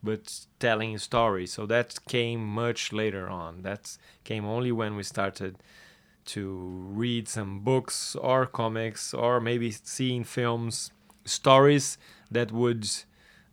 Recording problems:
none

